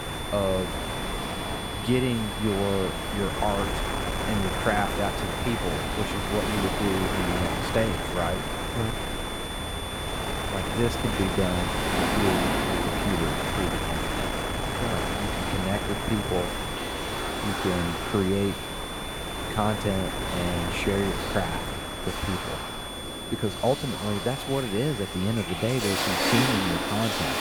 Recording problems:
wind noise on the microphone; heavy; 1 dB below the speech
high-pitched whine; loud; throughout; 3.5 kHz, 7 dB below the speech
rain or running water; loud; throughout; 3 dB below the speech

